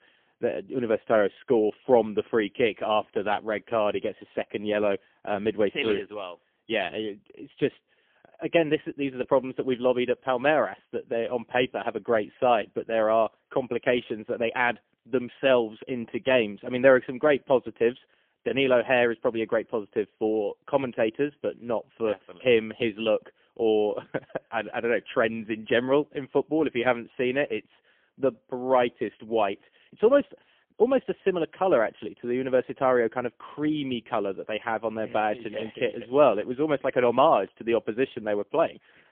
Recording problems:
phone-call audio; poor line; nothing above 3.5 kHz

